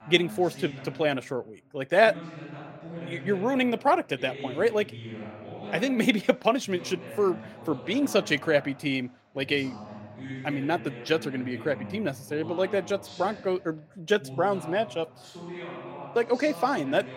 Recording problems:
voice in the background; noticeable; throughout; 15 dB below the speech

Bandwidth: 16 kHz